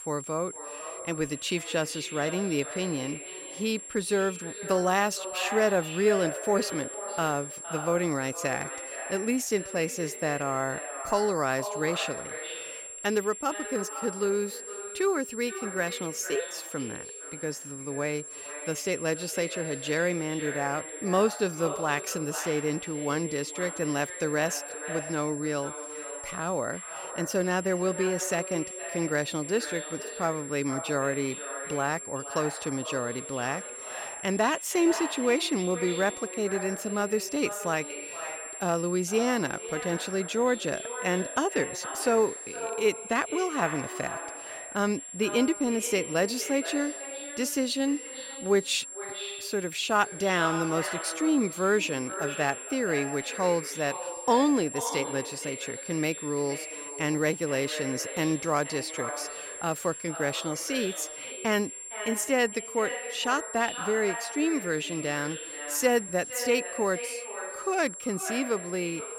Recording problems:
echo of what is said; strong; throughout; 460 ms later, 10 dB below the speech
high-pitched whine; loud; throughout; 7.5 kHz, 10 dB below the speech

